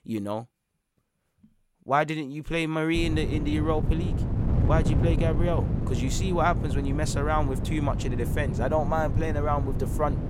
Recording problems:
wind noise on the microphone; heavy; from 3 s on; 9 dB below the speech

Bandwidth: 16 kHz